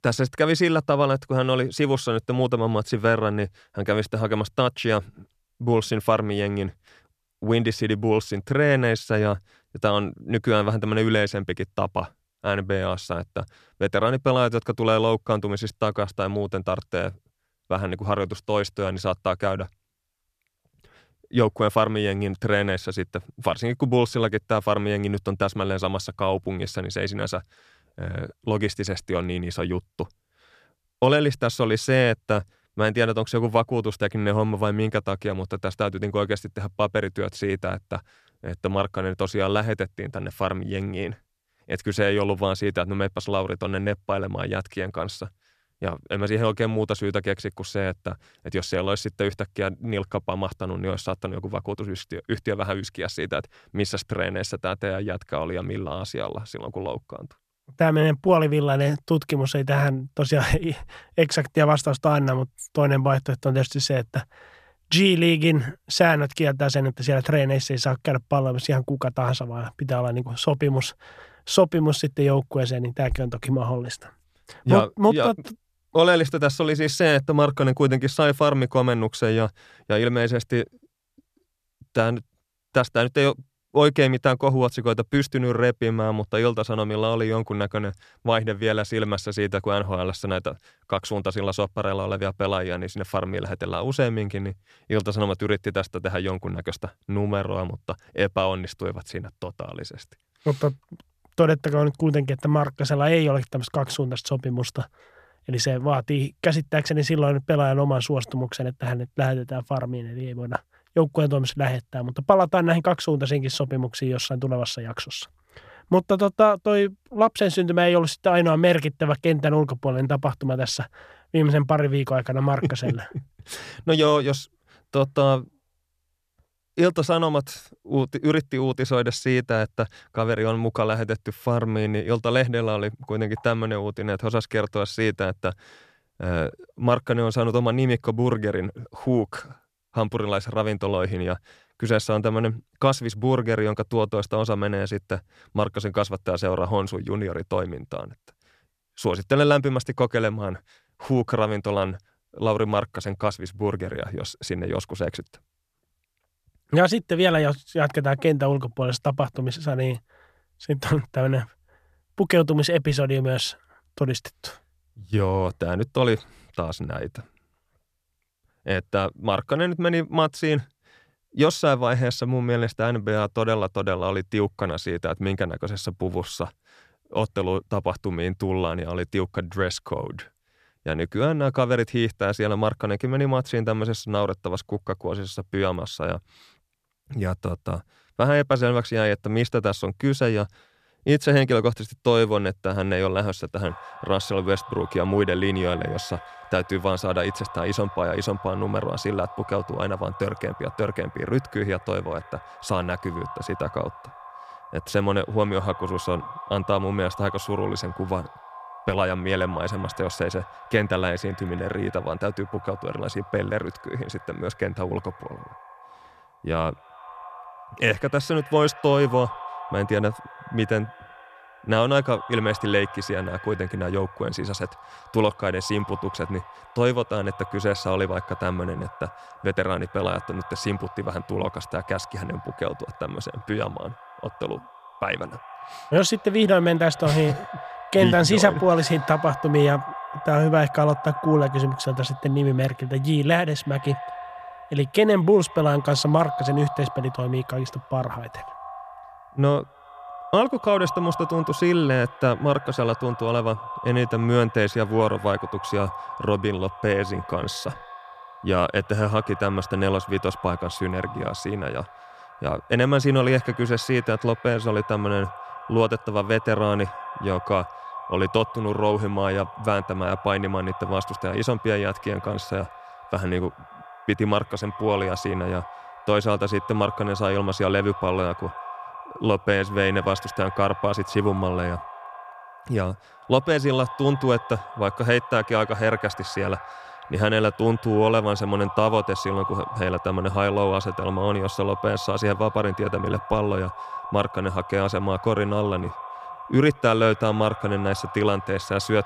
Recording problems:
echo of what is said; noticeable; from 3:14 on; 100 ms later, 15 dB below the speech

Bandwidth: 14.5 kHz